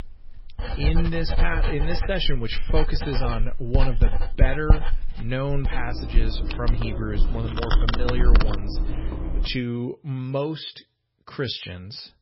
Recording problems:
garbled, watery; badly; nothing above 5.5 kHz
household noises; very loud; until 9.5 s; 2 dB above the speech

